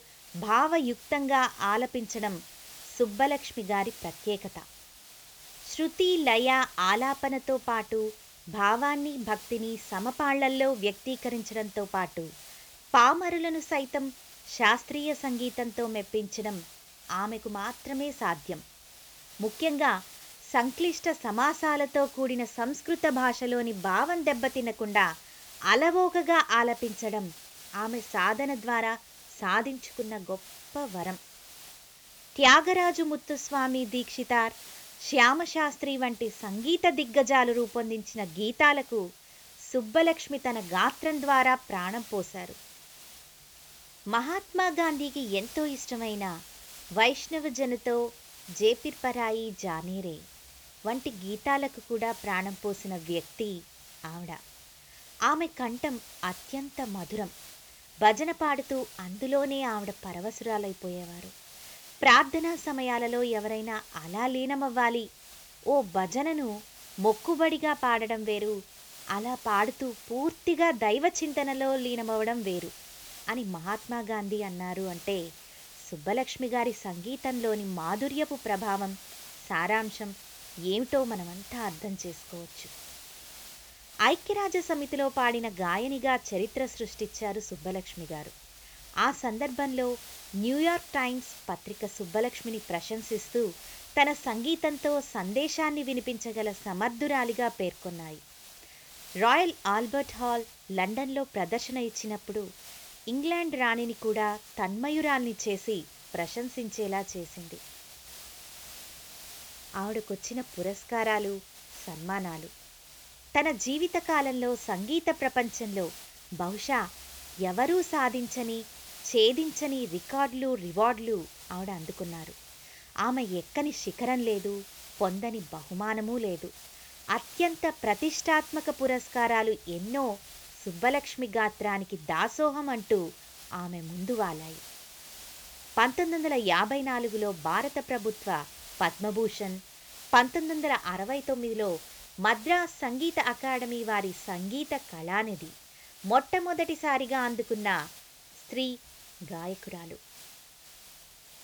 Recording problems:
high frequencies cut off; noticeable; nothing above 8 kHz
hiss; noticeable; throughout; 15 dB below the speech

